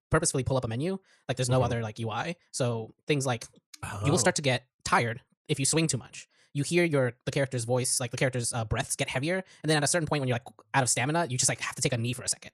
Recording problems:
wrong speed, natural pitch; too fast; 1.7 times normal speed

